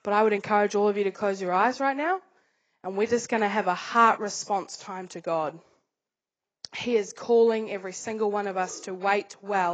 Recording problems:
garbled, watery; badly; nothing above 7.5 kHz
abrupt cut into speech; at the end

